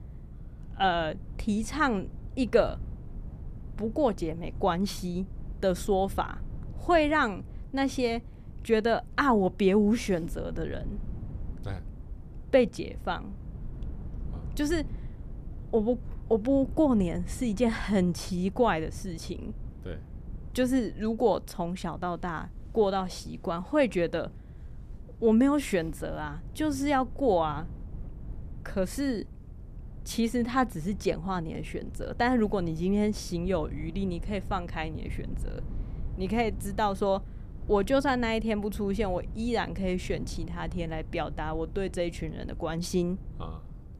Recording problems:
low rumble; faint; throughout; 25 dB below the speech

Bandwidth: 14.5 kHz